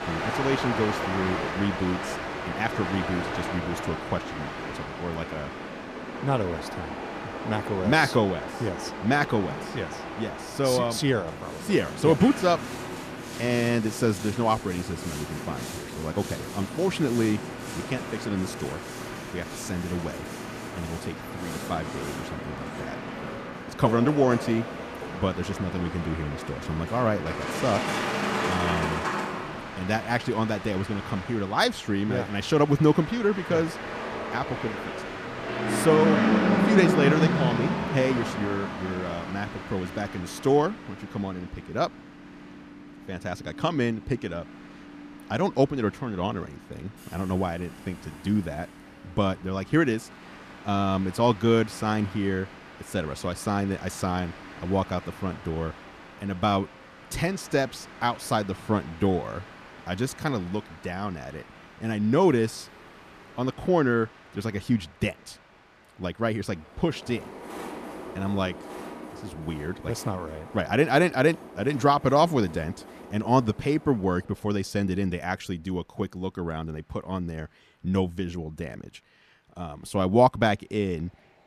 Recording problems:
train or aircraft noise; loud; throughout; 5 dB below the speech

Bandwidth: 14.5 kHz